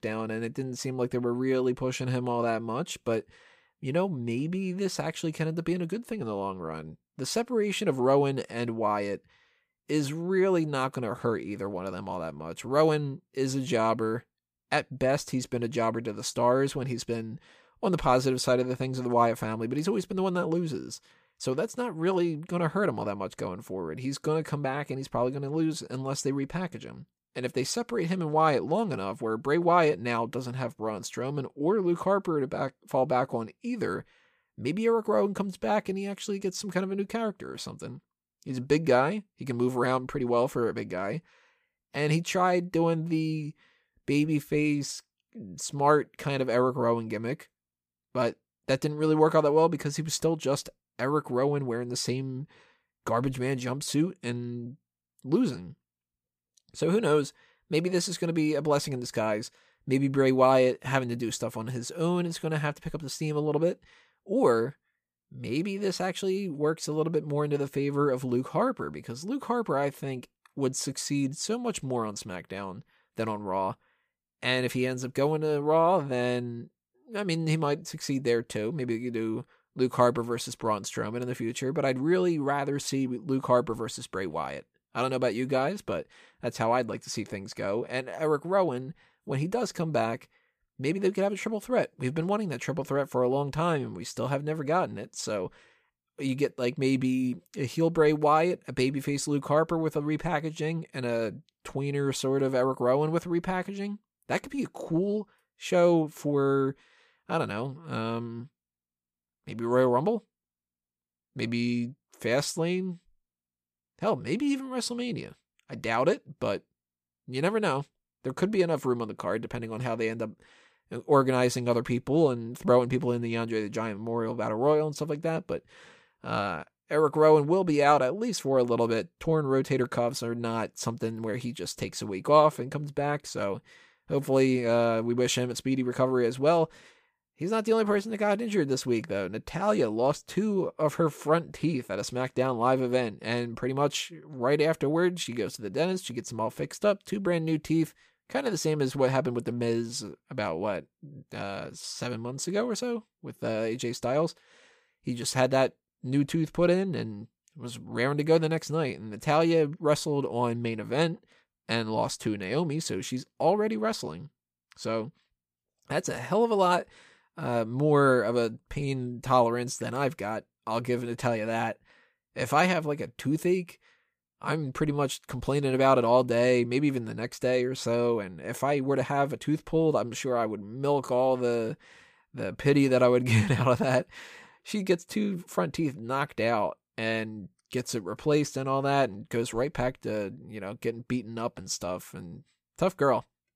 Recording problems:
none

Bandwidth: 15 kHz